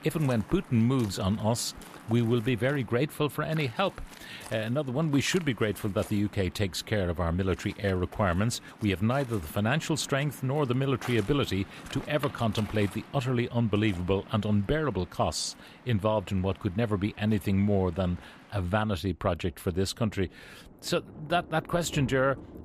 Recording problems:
rain or running water; noticeable; throughout; 20 dB below the speech

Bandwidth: 14.5 kHz